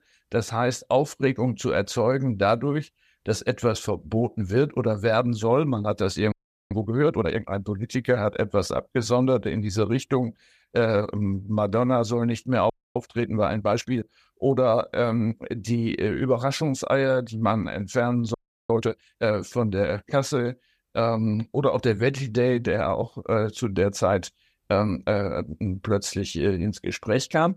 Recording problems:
audio freezing; at 6.5 s, at 13 s and at 18 s

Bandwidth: 14.5 kHz